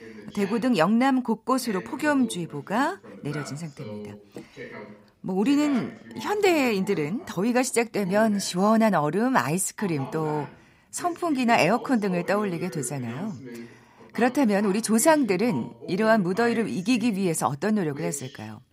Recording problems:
voice in the background; noticeable; throughout; 15 dB below the speech

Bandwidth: 15.5 kHz